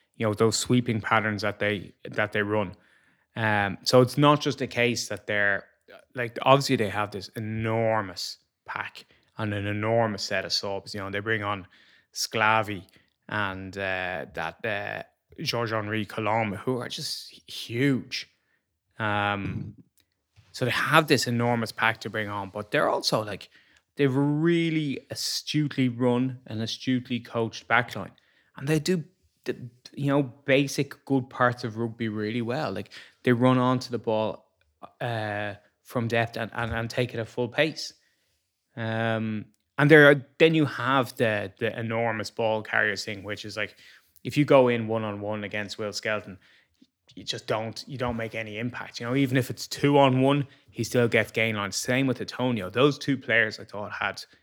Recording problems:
none

